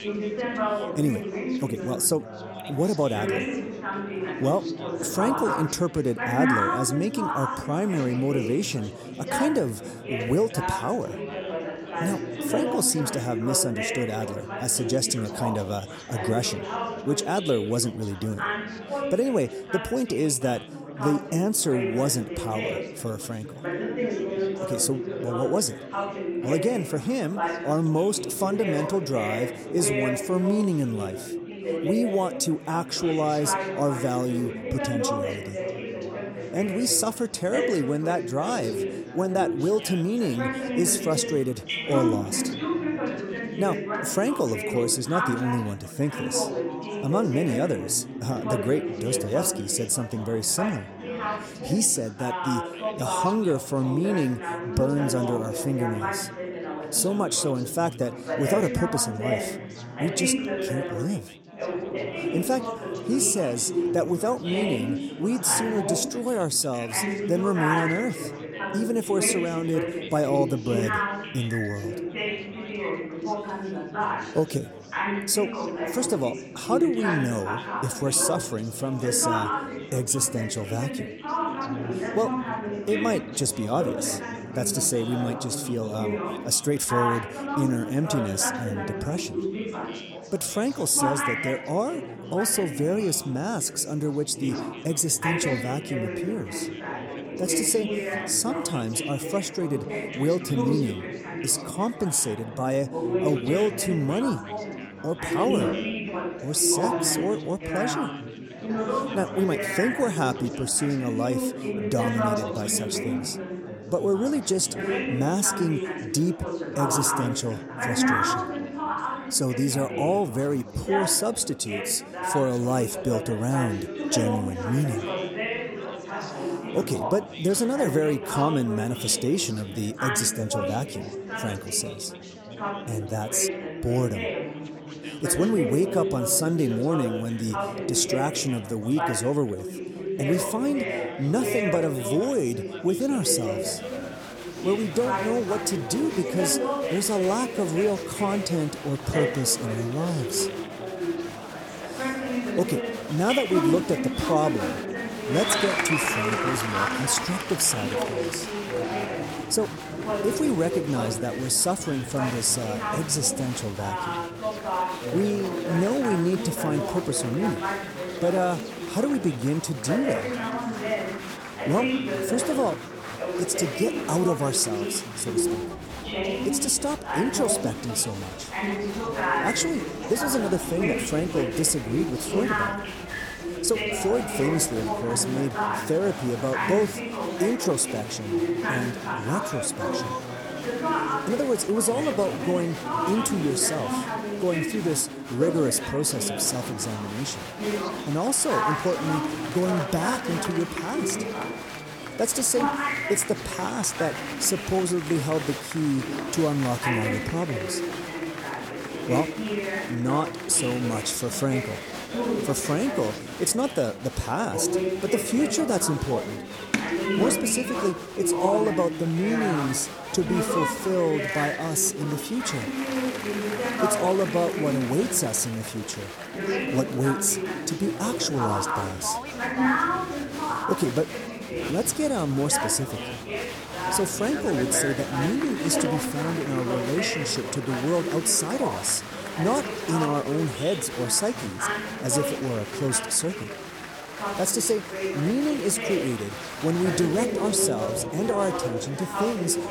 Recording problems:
chatter from many people; loud; throughout; 4 dB below the speech

